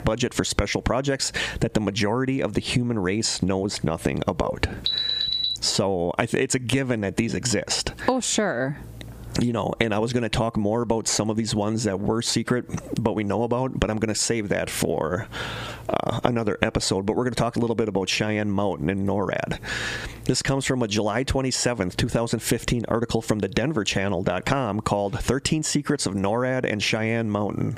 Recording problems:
squashed, flat; somewhat
alarm; loud; at 5 s; peak 3 dB above the speech

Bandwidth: 15 kHz